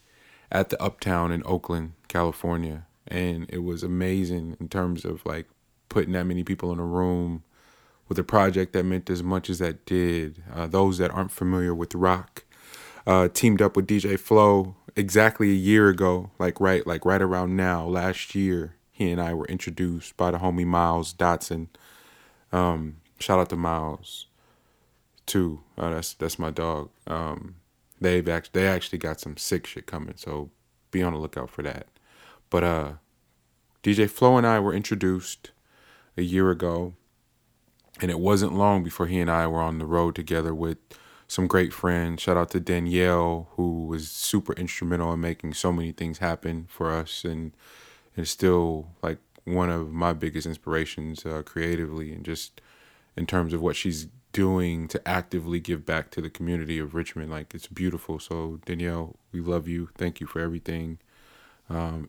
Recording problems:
none

